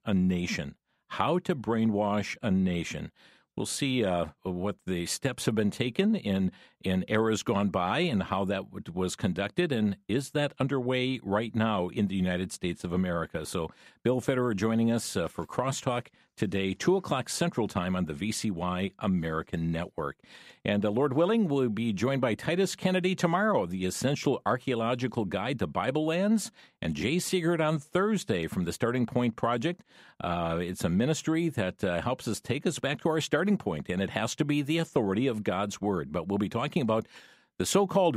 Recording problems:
abrupt cut into speech; at the end

